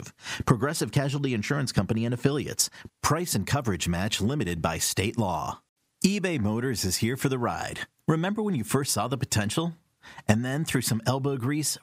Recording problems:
squashed, flat; somewhat

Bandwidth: 15.5 kHz